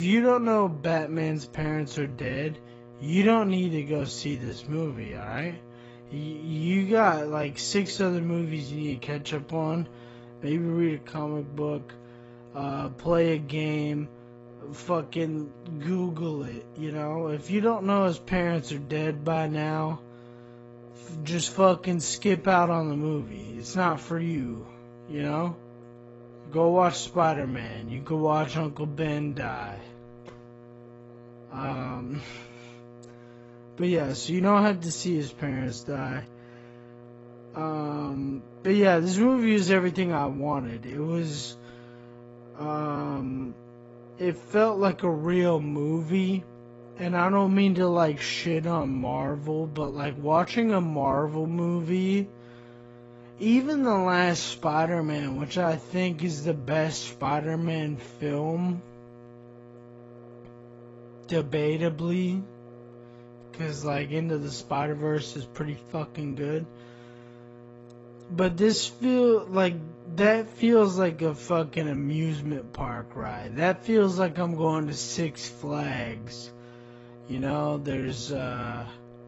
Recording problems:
garbled, watery; badly; nothing above 7.5 kHz
wrong speed, natural pitch; too slow; 0.6 times normal speed
electrical hum; faint; throughout; 60 Hz, 20 dB below the speech
abrupt cut into speech; at the start

